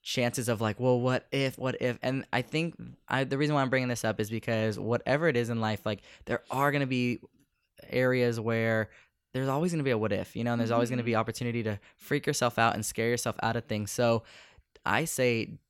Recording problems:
none

